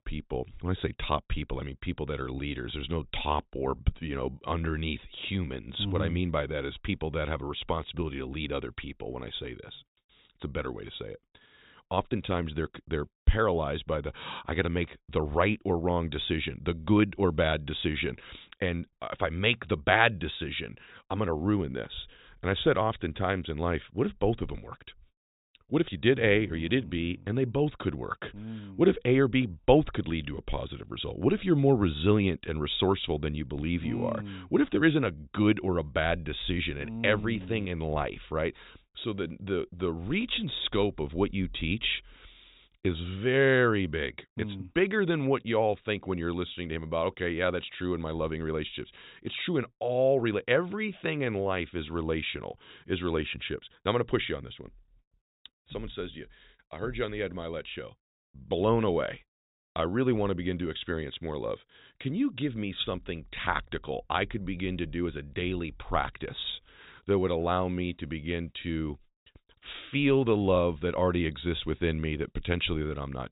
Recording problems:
high frequencies cut off; severe; nothing above 4 kHz

